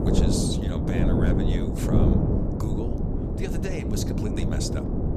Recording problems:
wind noise on the microphone; heavy; 4 dB above the speech

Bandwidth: 14.5 kHz